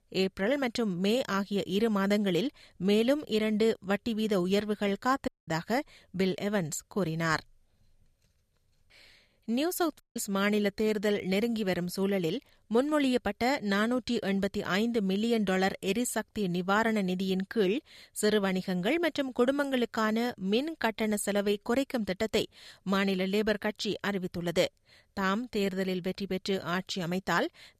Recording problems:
audio cutting out; at 5.5 s and at 10 s

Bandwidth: 14.5 kHz